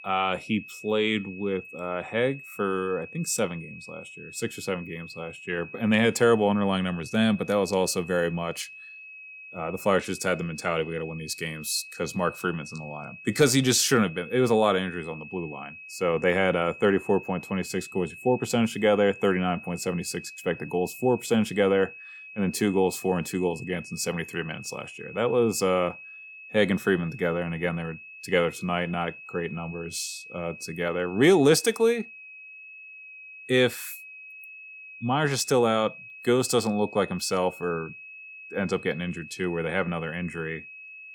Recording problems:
high-pitched whine; noticeable; throughout; 2.5 kHz, 15 dB below the speech

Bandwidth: 18 kHz